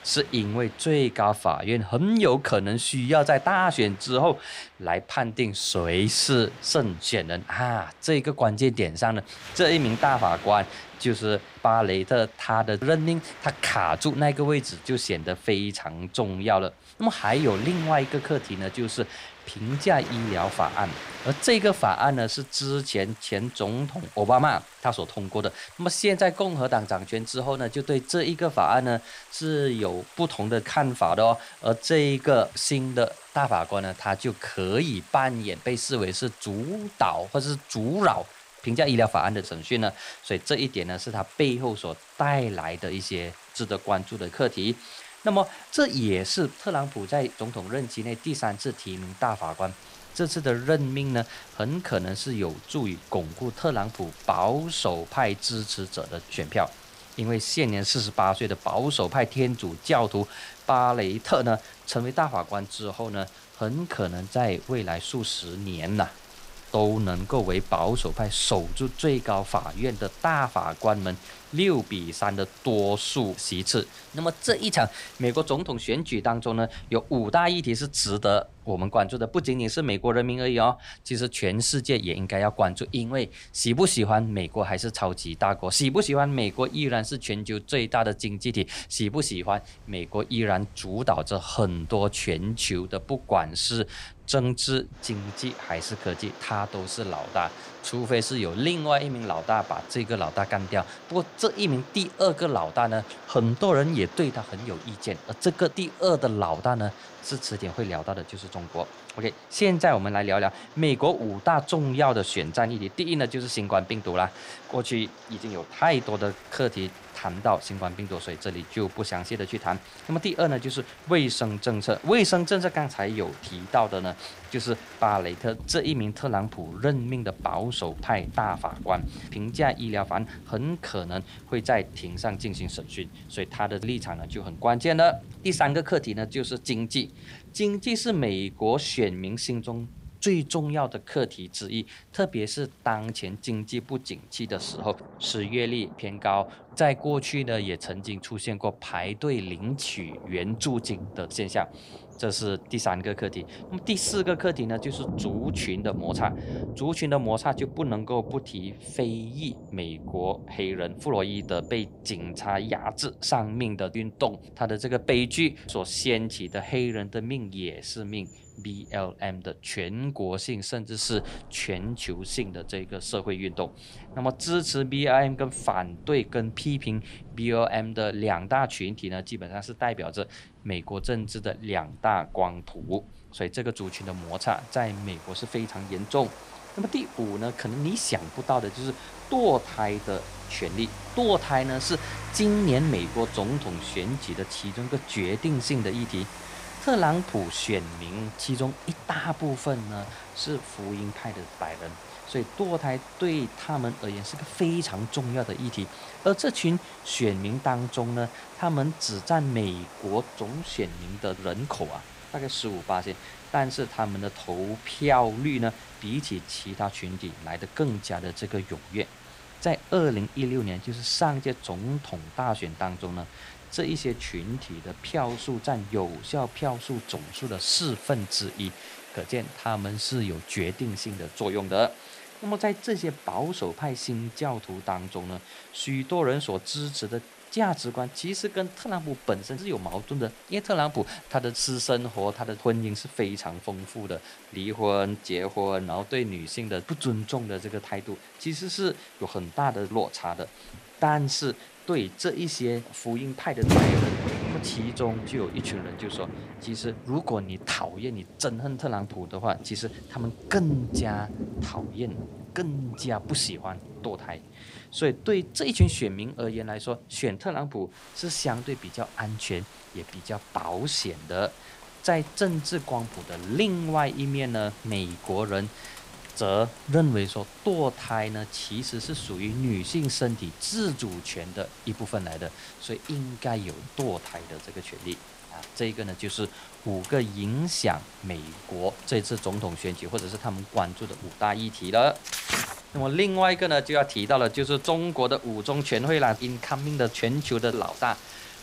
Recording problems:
rain or running water; noticeable; throughout; 15 dB below the speech

